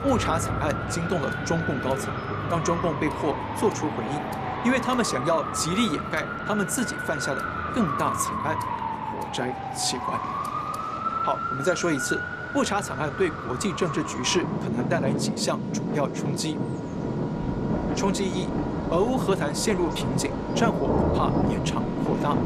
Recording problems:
rain or running water; loud; throughout; 8 dB below the speech
traffic noise; loud; throughout; 2 dB below the speech
background music; noticeable; throughout; 20 dB below the speech

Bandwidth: 14 kHz